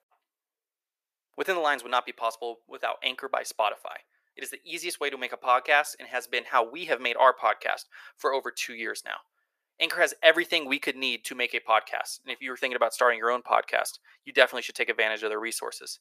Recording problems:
thin; very; fading below 500 Hz

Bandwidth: 14.5 kHz